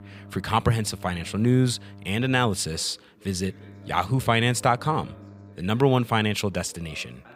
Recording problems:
electrical hum; faint; until 2.5 s and from 3.5 to 5.5 s; 50 Hz, 25 dB below the speech
voice in the background; faint; throughout; 25 dB below the speech

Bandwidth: 15.5 kHz